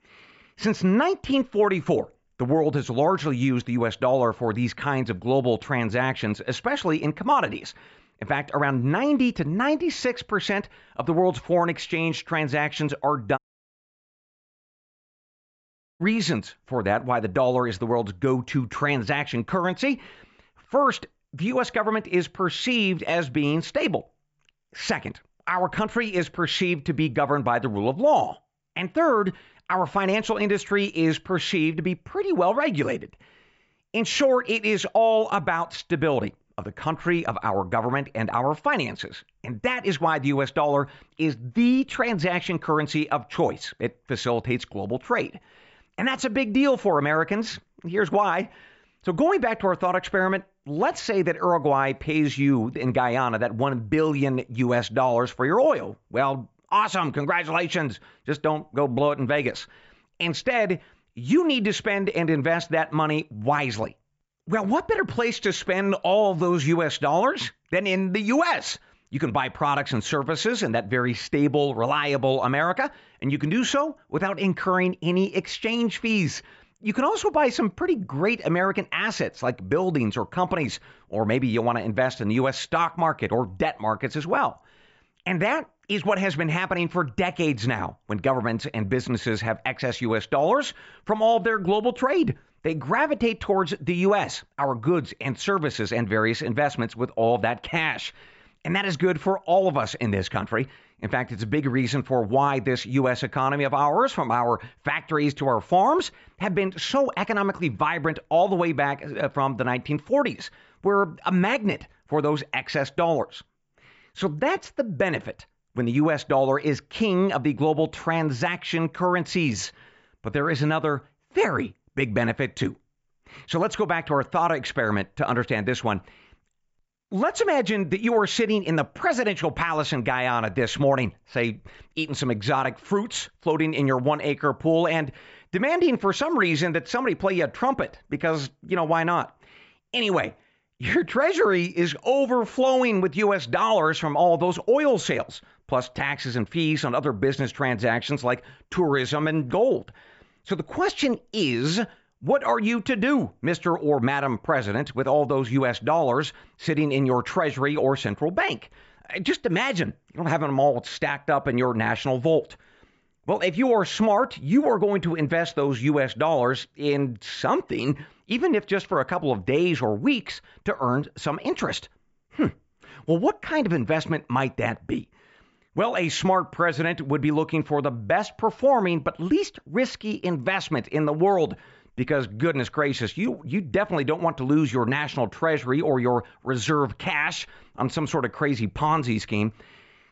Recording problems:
high frequencies cut off; noticeable; nothing above 8 kHz
audio cutting out; at 13 s for 2.5 s

